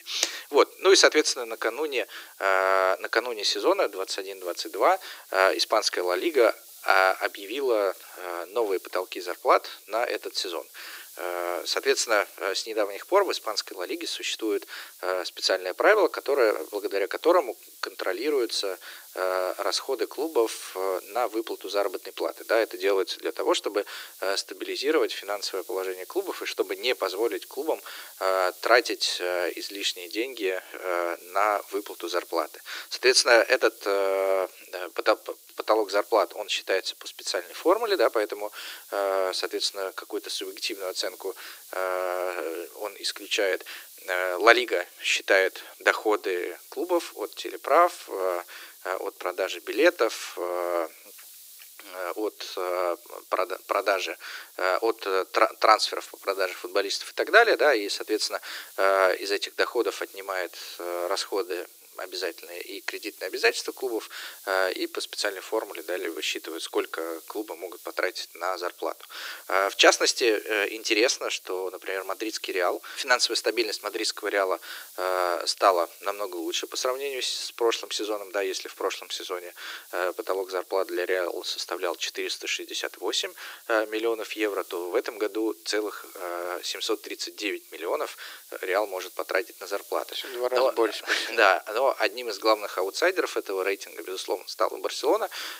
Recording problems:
thin; very; fading below 300 Hz
hiss; noticeable; throughout; 20 dB below the speech

